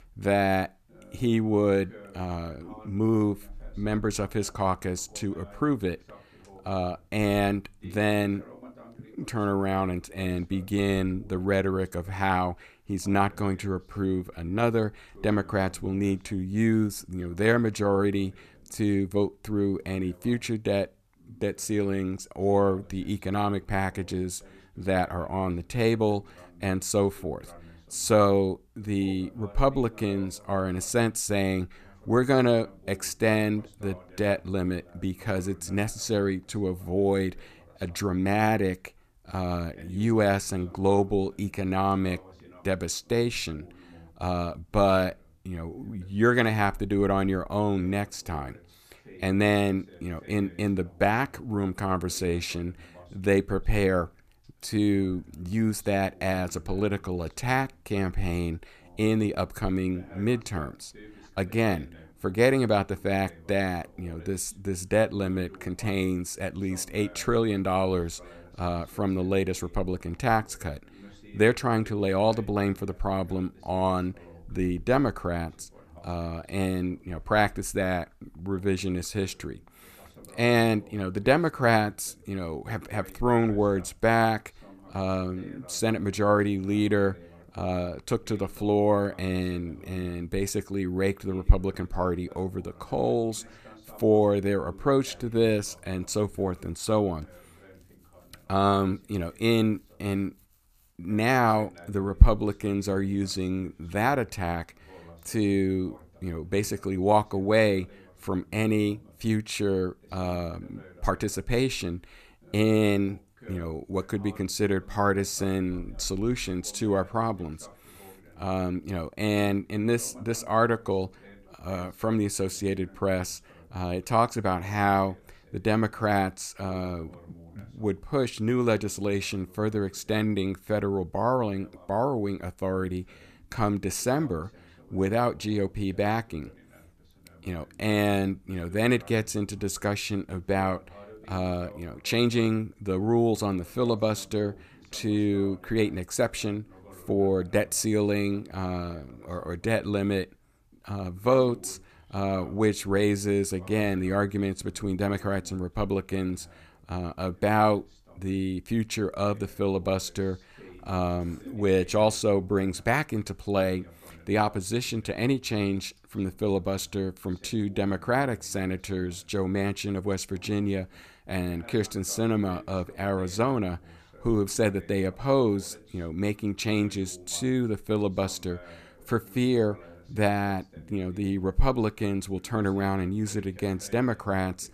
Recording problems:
voice in the background; faint; throughout; 25 dB below the speech

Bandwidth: 14.5 kHz